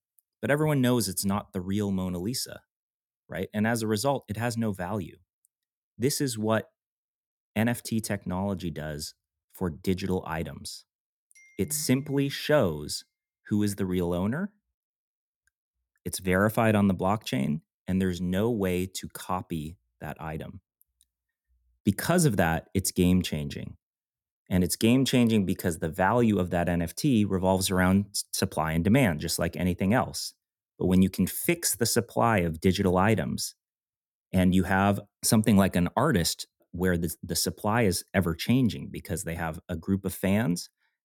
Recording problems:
none

